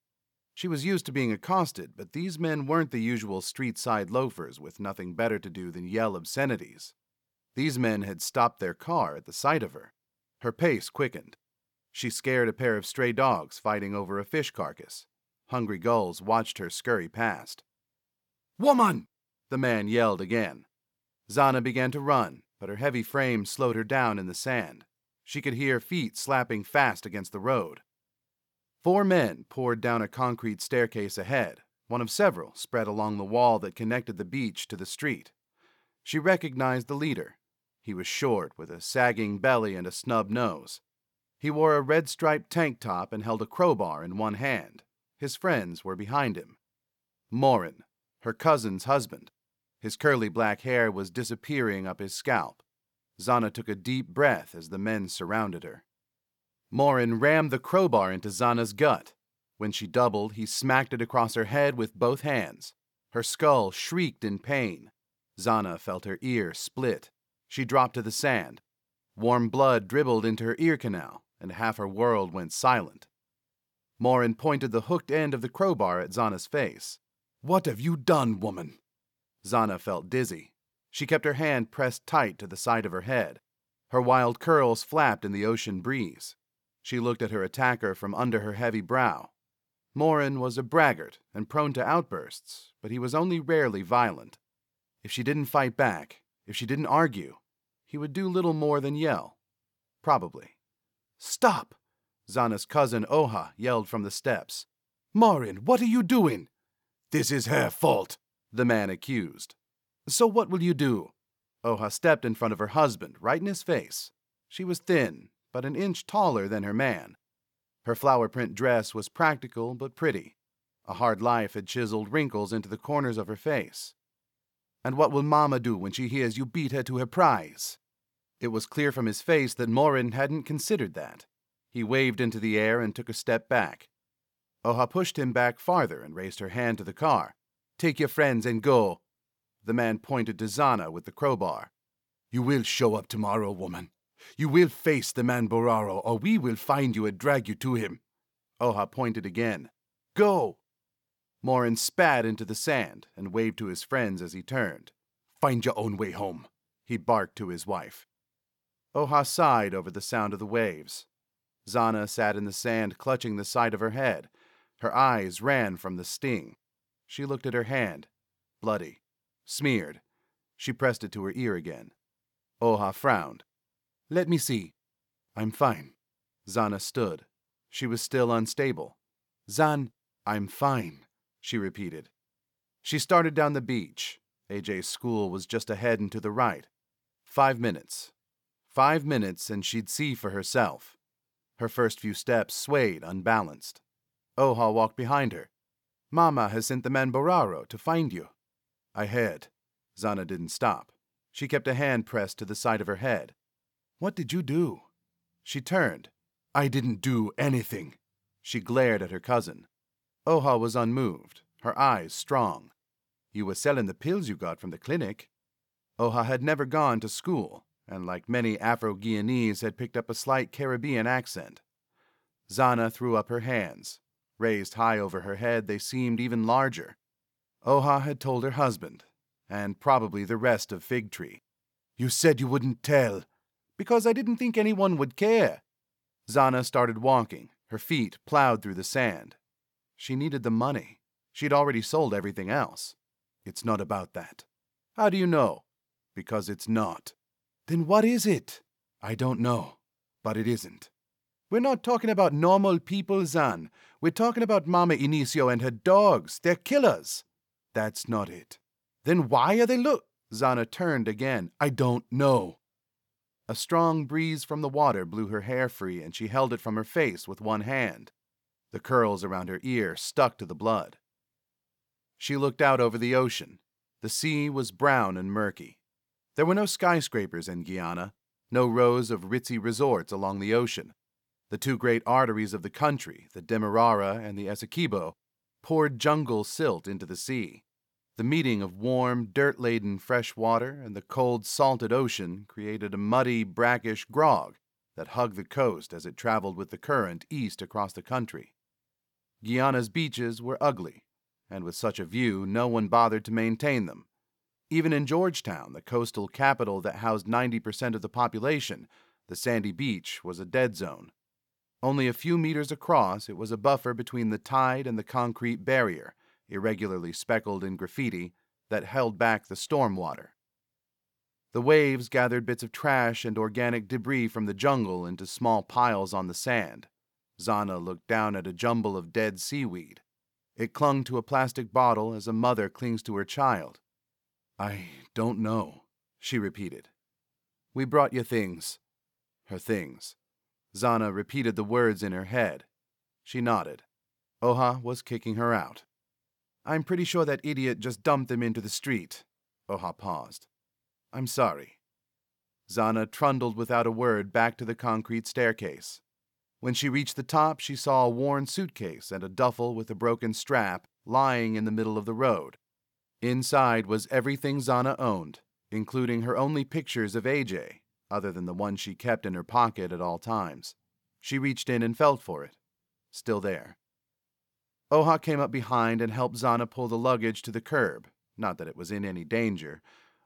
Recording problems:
none

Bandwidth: 18.5 kHz